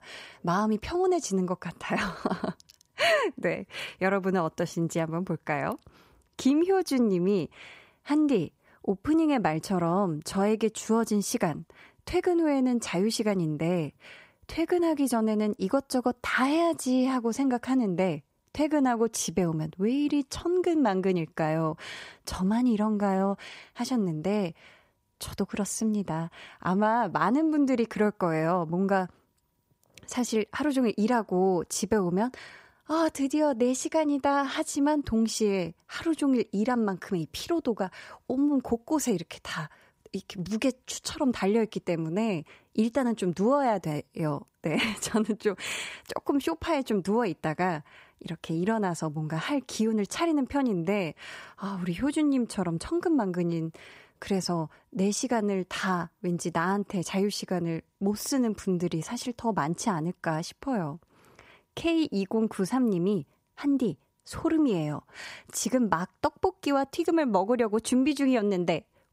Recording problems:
none

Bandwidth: 15.5 kHz